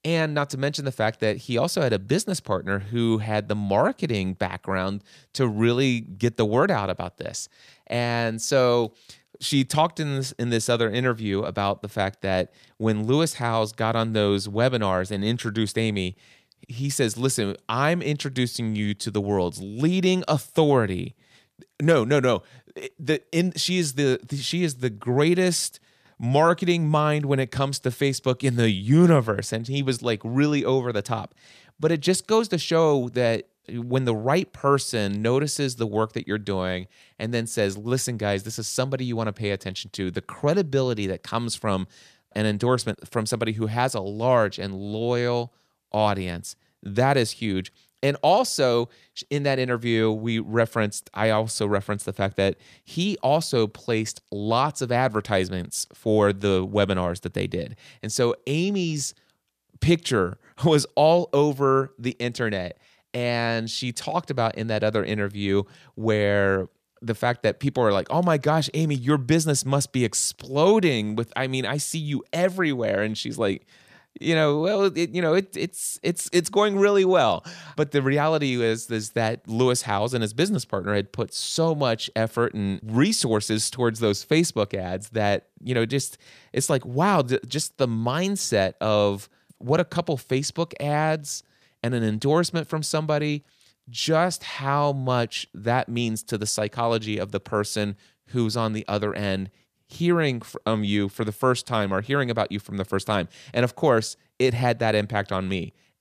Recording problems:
none

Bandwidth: 14.5 kHz